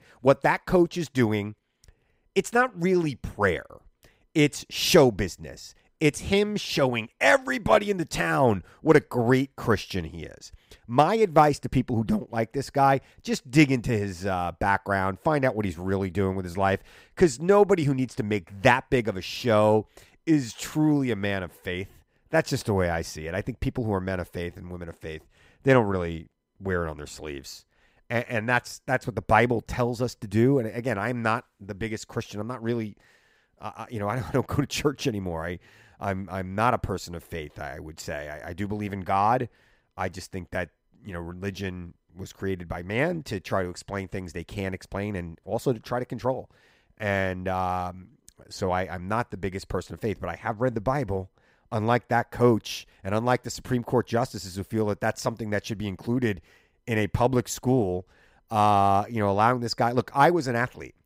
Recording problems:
none

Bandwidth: 15.5 kHz